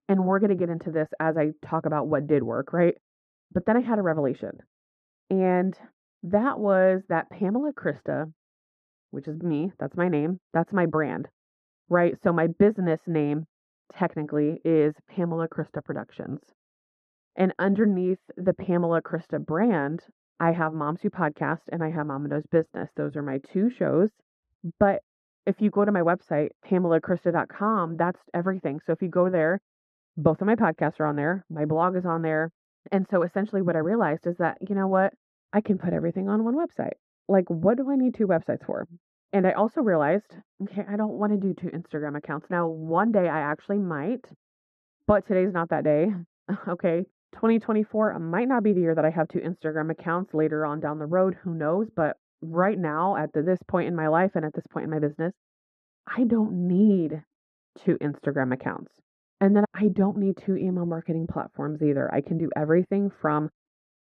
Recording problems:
muffled; very; fading above 2.5 kHz

